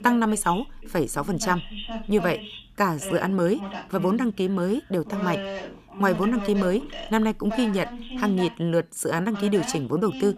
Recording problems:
voice in the background; noticeable; throughout; 10 dB below the speech

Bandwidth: 14.5 kHz